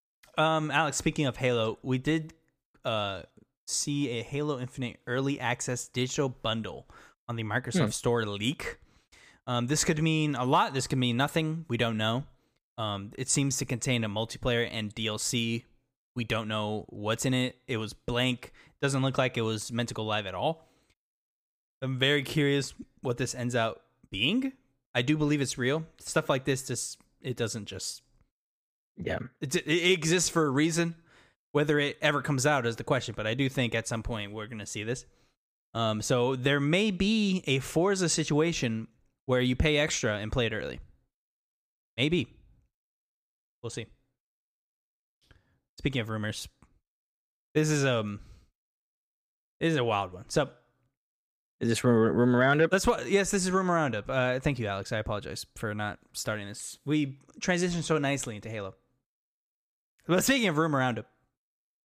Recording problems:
none

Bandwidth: 15 kHz